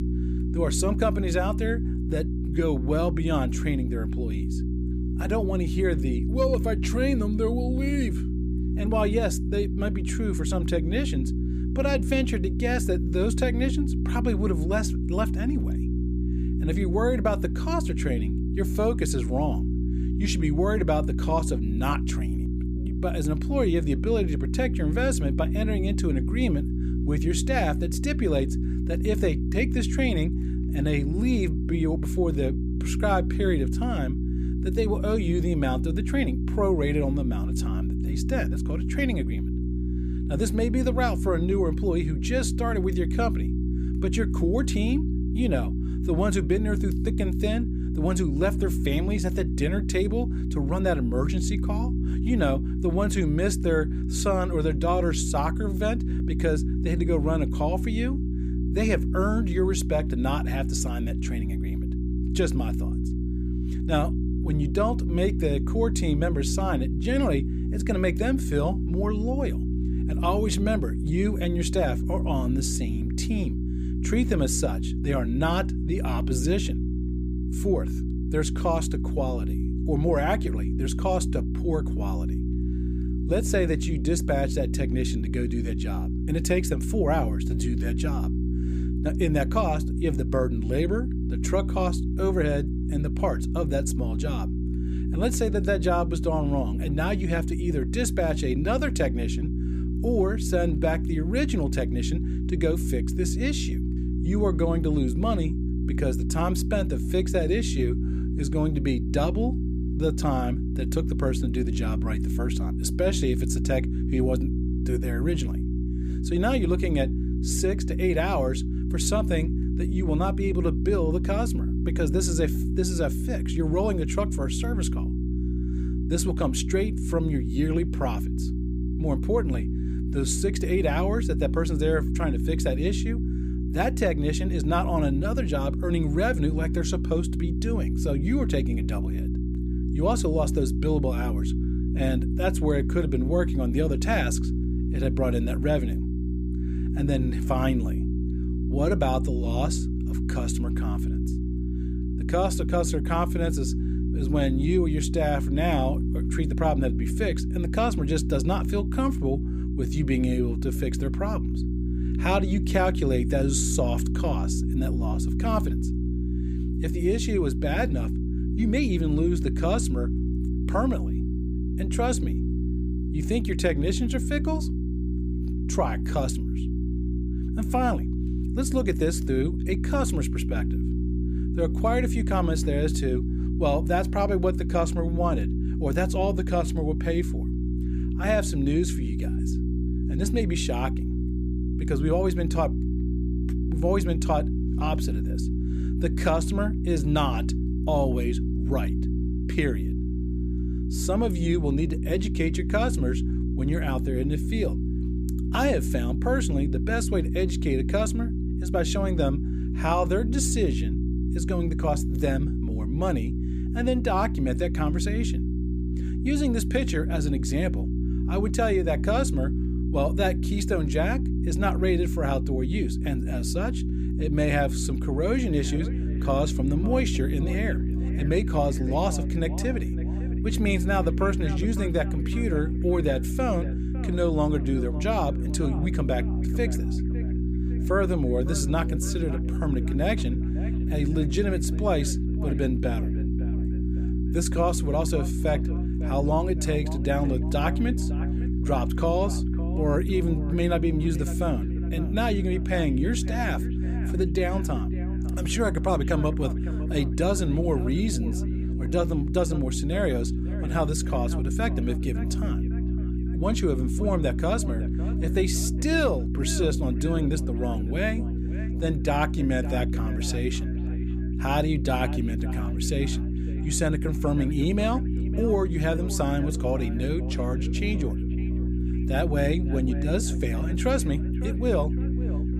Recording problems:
echo of what is said; noticeable; from 3:45 on; 560 ms later, 20 dB below the speech
electrical hum; loud; throughout; 60 Hz, 8 dB below the speech

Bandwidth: 15 kHz